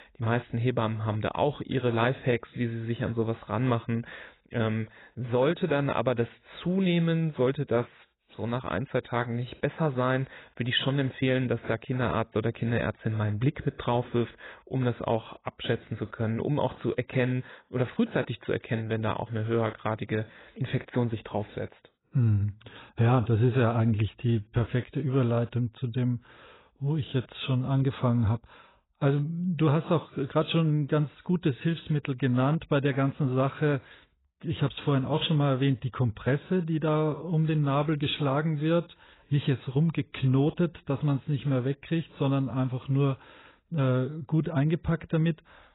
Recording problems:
garbled, watery; badly; nothing above 4 kHz

